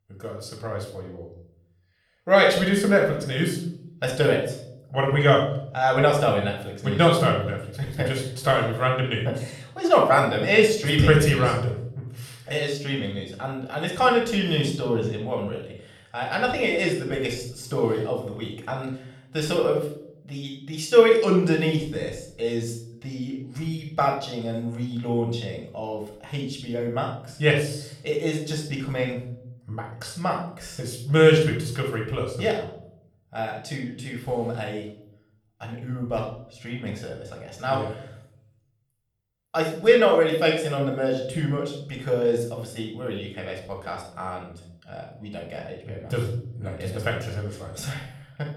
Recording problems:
room echo; noticeable; dies away in 0.6 s
off-mic speech; somewhat distant

